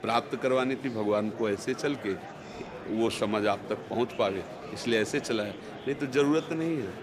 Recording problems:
murmuring crowd; noticeable; throughout; 10 dB below the speech

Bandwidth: 15.5 kHz